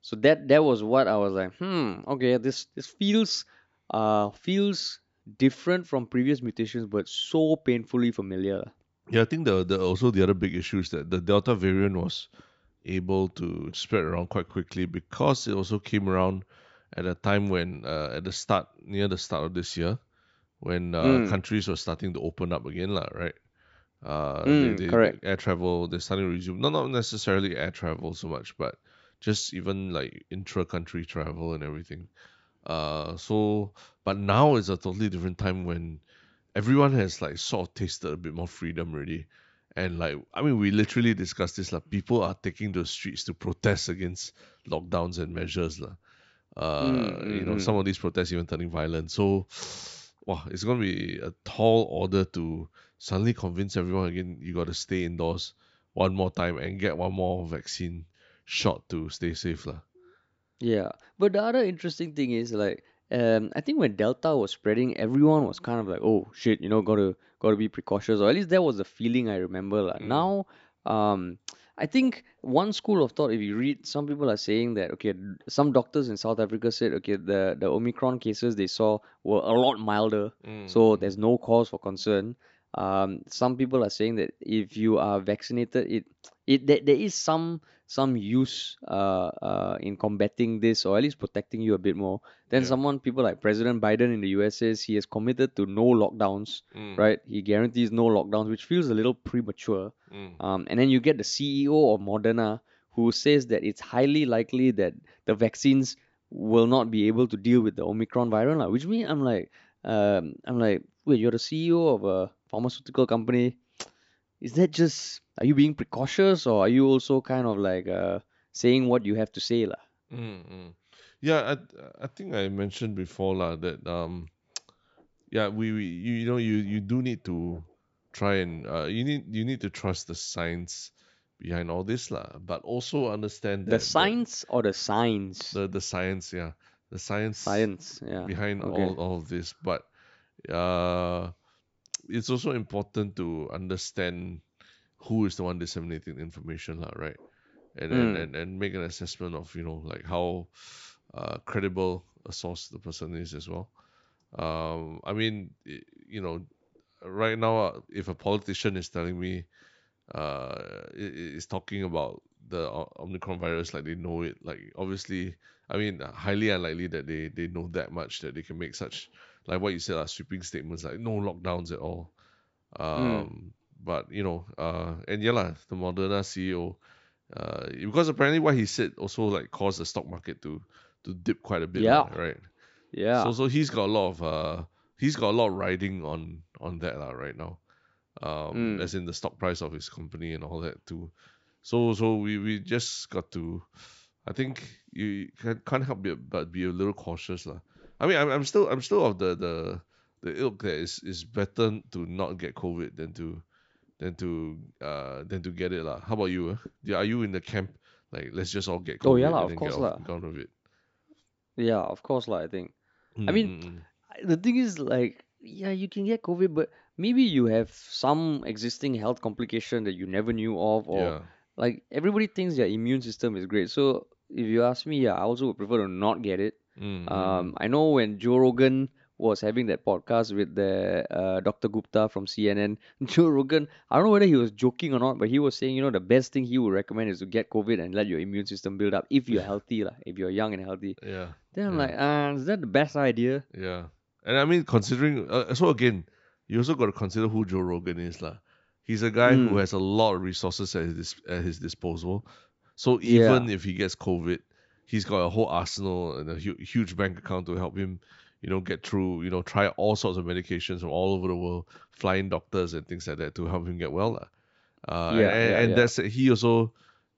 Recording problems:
high frequencies cut off; noticeable; nothing above 8 kHz

